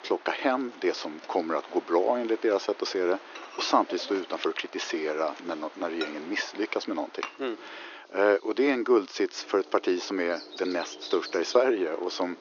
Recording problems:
thin; very; fading below 350 Hz
high frequencies cut off; noticeable; nothing above 6.5 kHz
animal sounds; noticeable; throughout; 20 dB below the speech
household noises; noticeable; throughout; 15 dB below the speech
rain or running water; noticeable; throughout; 20 dB below the speech

